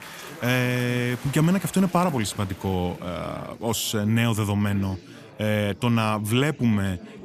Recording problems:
chatter from many people; noticeable; throughout; 15 dB below the speech

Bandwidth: 14.5 kHz